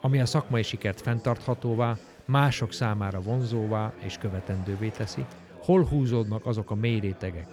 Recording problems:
murmuring crowd; noticeable; throughout; 20 dB below the speech

